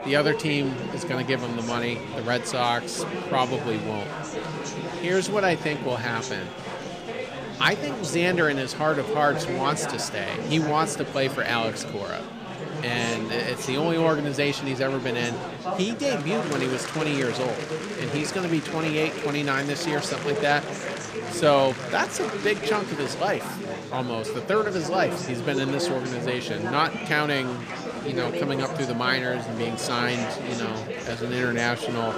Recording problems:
chatter from many people; loud; throughout; 5 dB below the speech

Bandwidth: 15 kHz